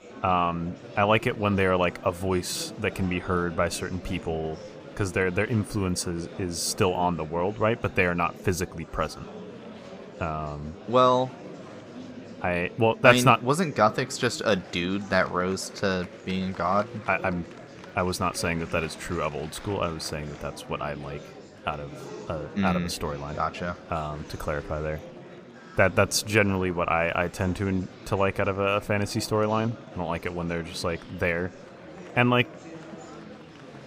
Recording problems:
murmuring crowd; noticeable; throughout; 15 dB below the speech

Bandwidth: 15 kHz